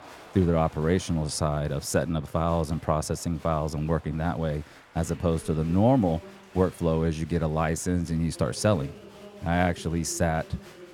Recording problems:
crowd noise; faint; throughout; 20 dB below the speech

